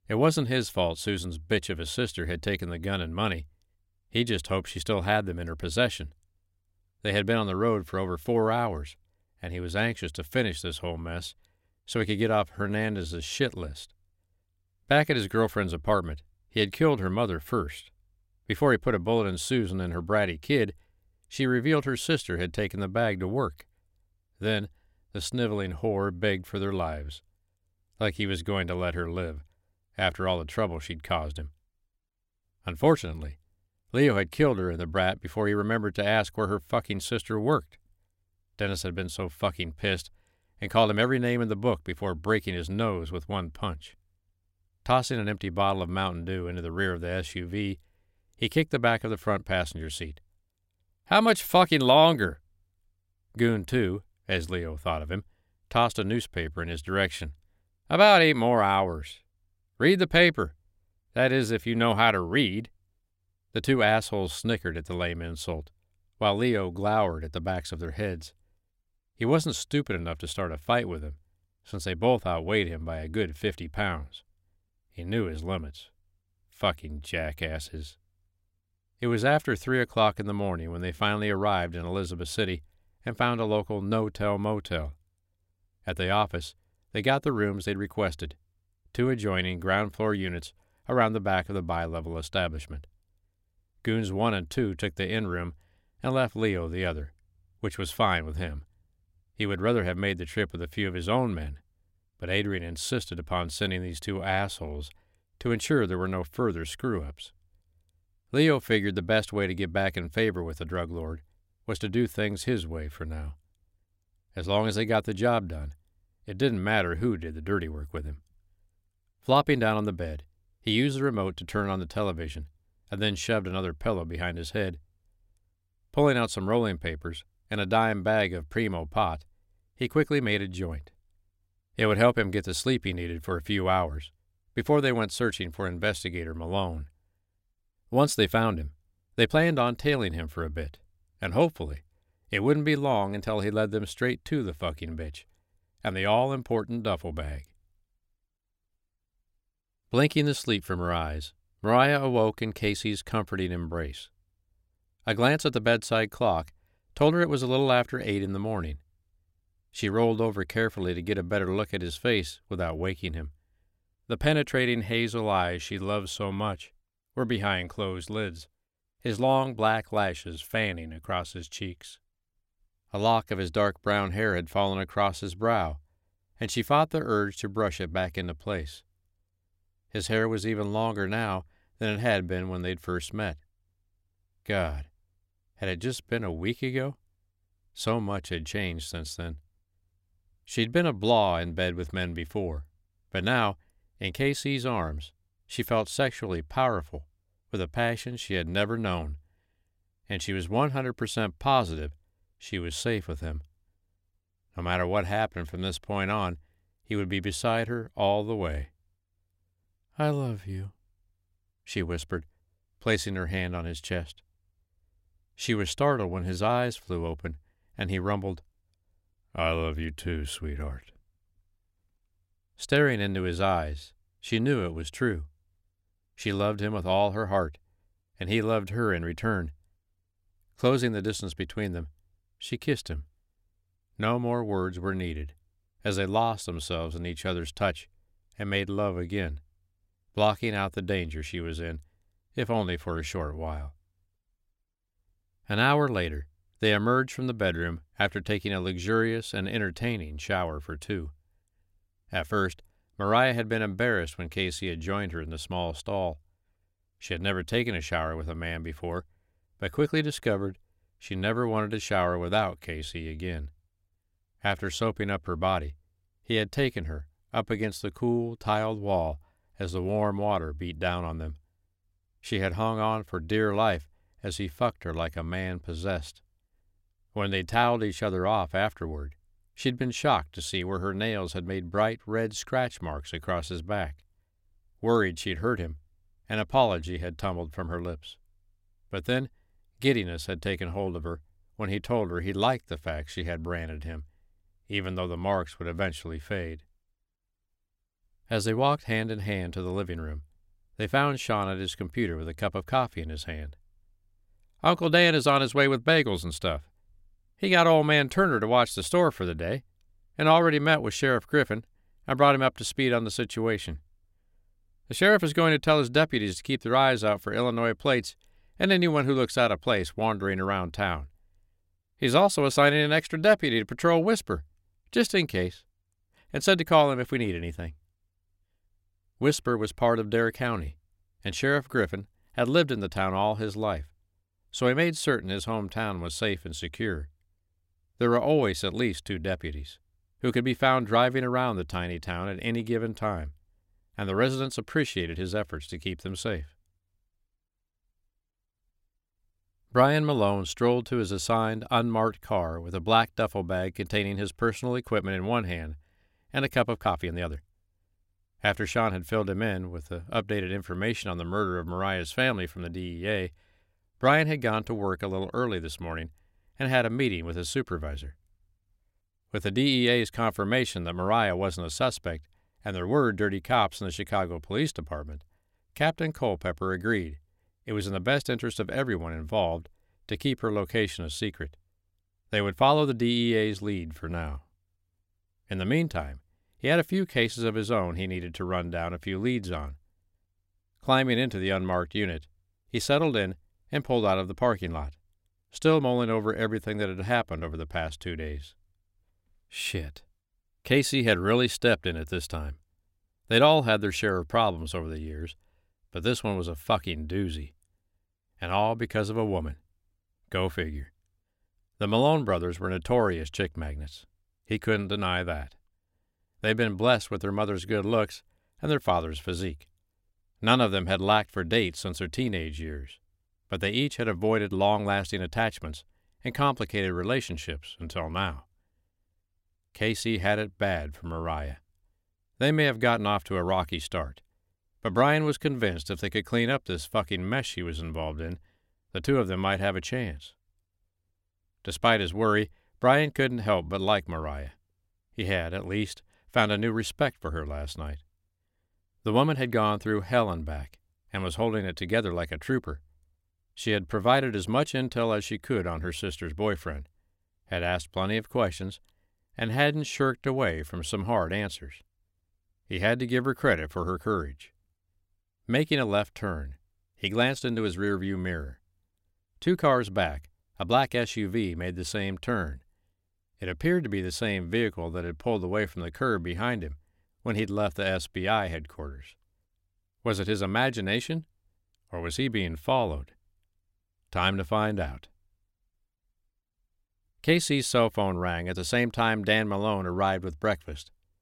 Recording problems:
uneven, jittery; strongly; from 13 s to 7:40

